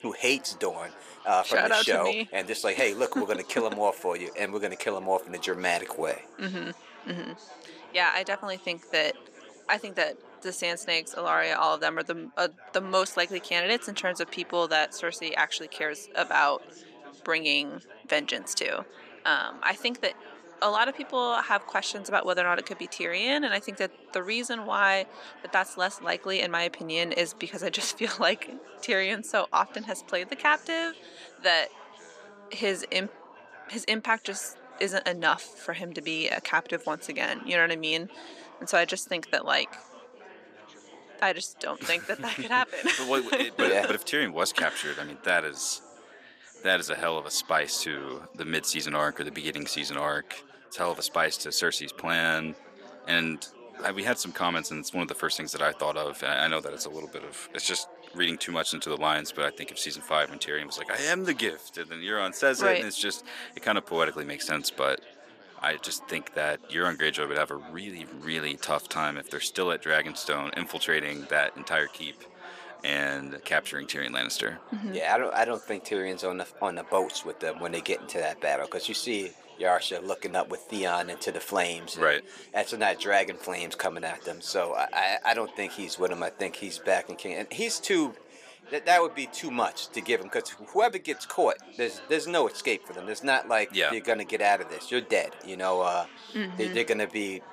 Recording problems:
thin; somewhat; fading below 400 Hz
chatter from many people; faint; throughout; 20 dB below the speech

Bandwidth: 14.5 kHz